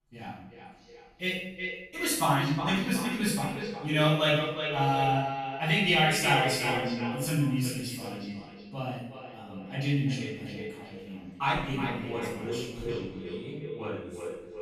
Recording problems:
echo of what is said; strong; throughout; 360 ms later, 7 dB below the speech
off-mic speech; far
room echo; noticeable; dies away in 0.7 s

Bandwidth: 14.5 kHz